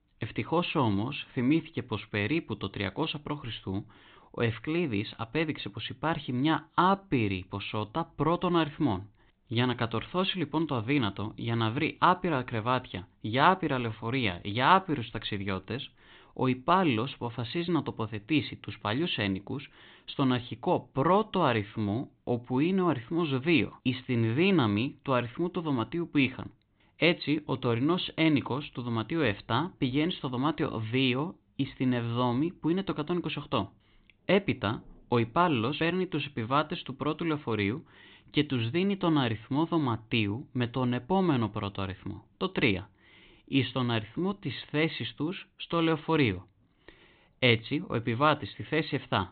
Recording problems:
high frequencies cut off; severe; nothing above 4 kHz

